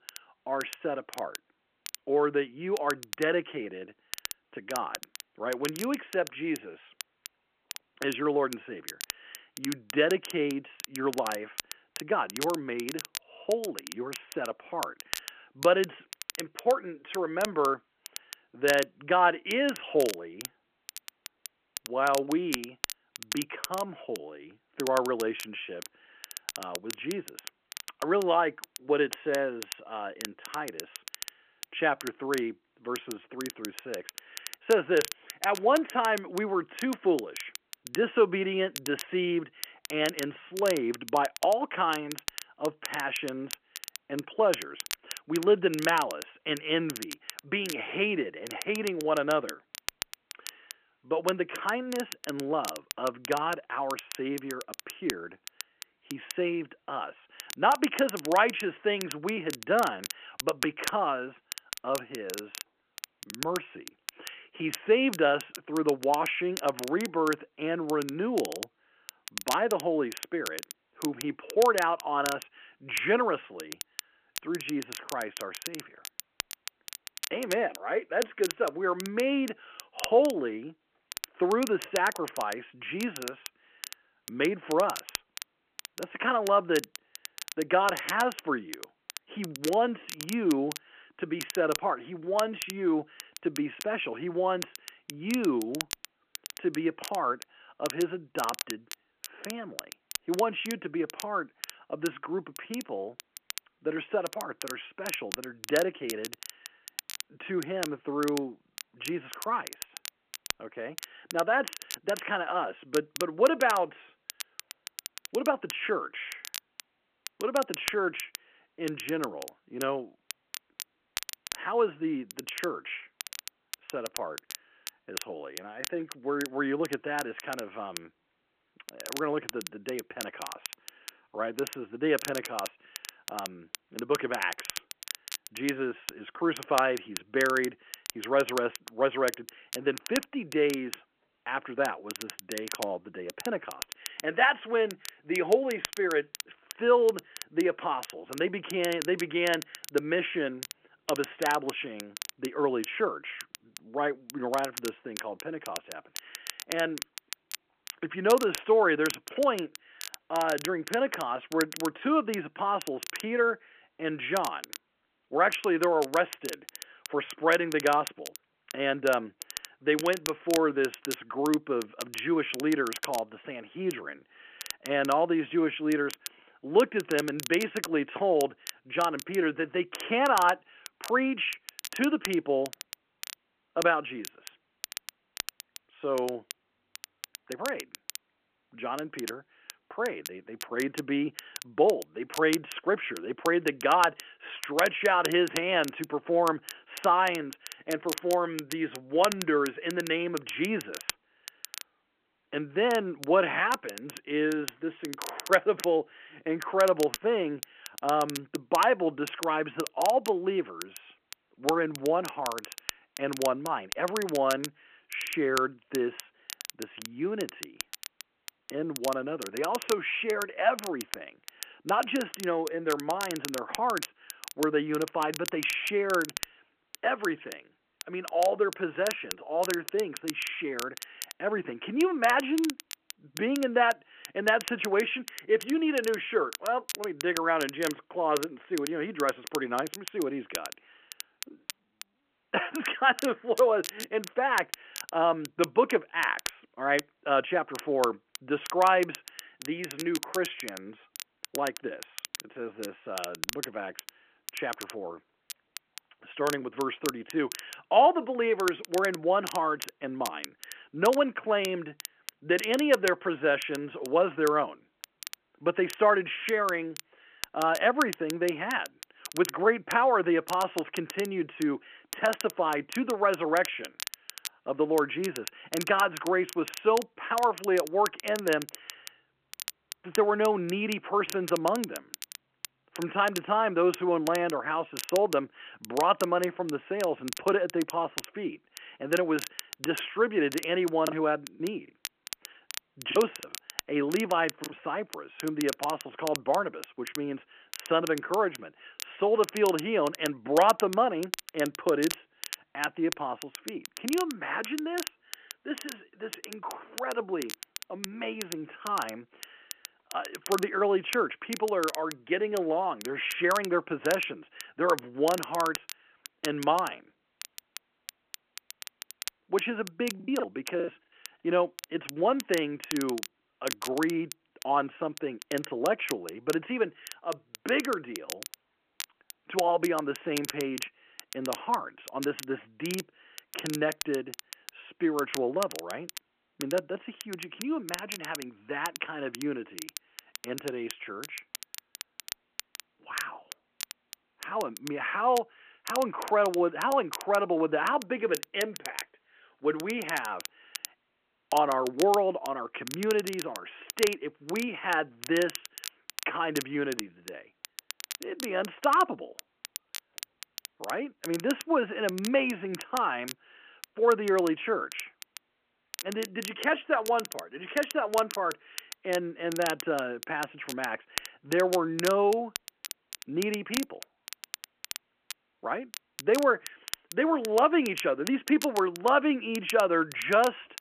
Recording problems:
phone-call audio
crackle, like an old record; noticeable; 10 dB below the speech
choppy; very; from 4:51 to 4:55 and from 5:20 to 5:21; 9% of the speech affected

